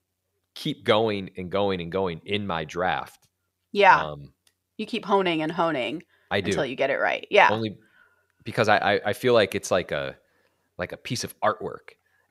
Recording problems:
none

